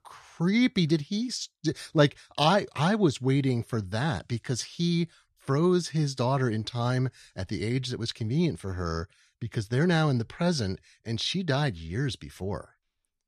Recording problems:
none

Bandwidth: 14 kHz